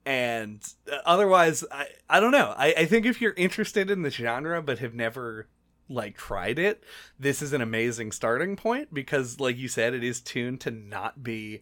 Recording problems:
none

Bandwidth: 17.5 kHz